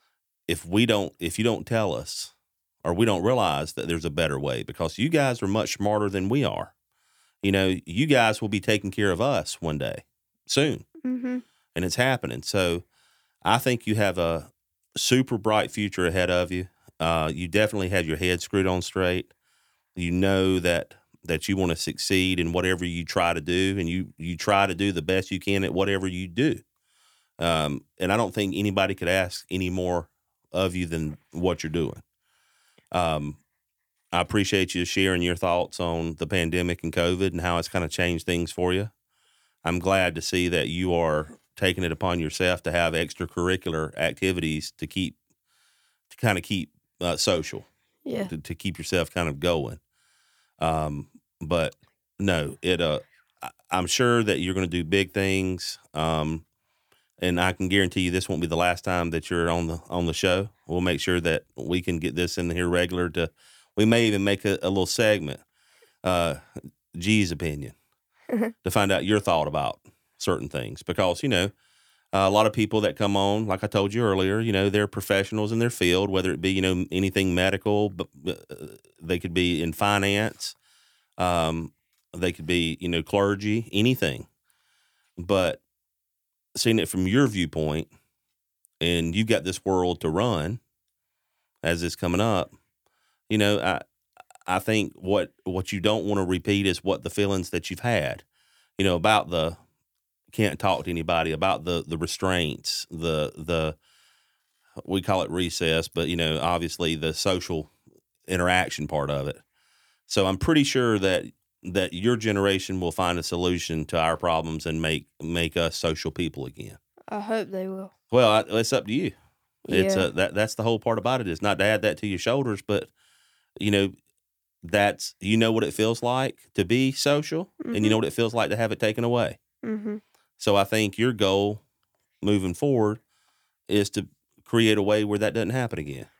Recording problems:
none

